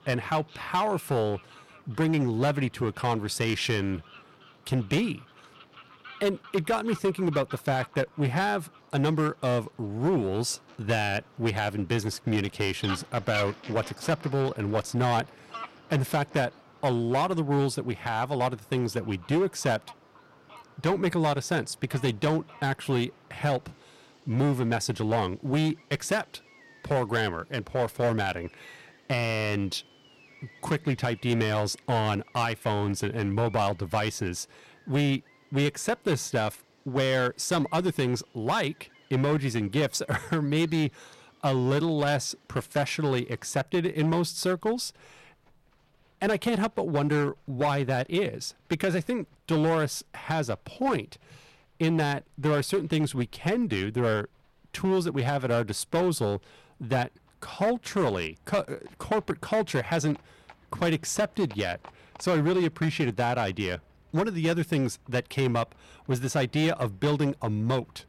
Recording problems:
distortion; slight; 8% of the sound clipped
animal sounds; faint; throughout; 20 dB below the speech

